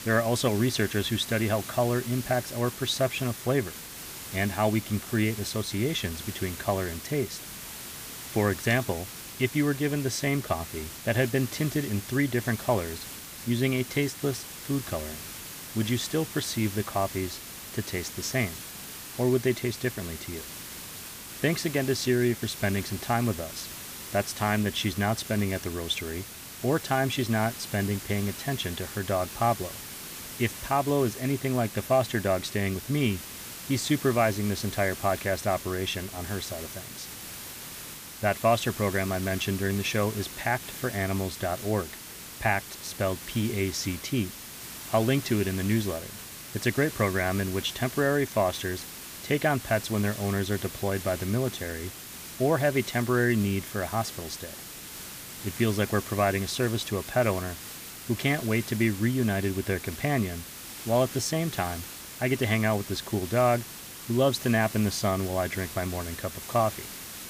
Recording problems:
hiss; noticeable; throughout; 10 dB below the speech

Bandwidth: 15 kHz